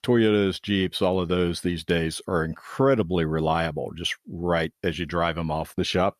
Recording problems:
none

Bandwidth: 14.5 kHz